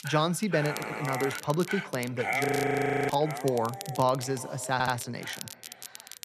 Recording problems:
echo of what is said; faint; throughout; 360 ms later, 20 dB below the speech
animal sounds; loud; throughout; 6 dB below the speech
crackle, like an old record; noticeable; 15 dB below the speech
audio stuttering; at 0.5 s and at 4.5 s
audio freezing; at 2.5 s for 0.5 s

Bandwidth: 13.5 kHz